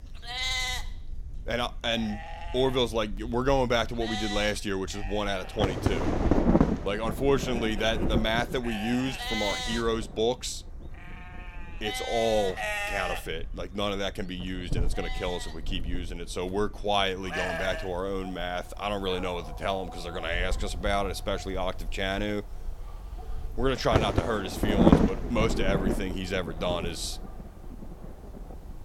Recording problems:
wind noise on the microphone; heavy; 2 dB below the speech
animal sounds; loud; throughout; 6 dB below the speech

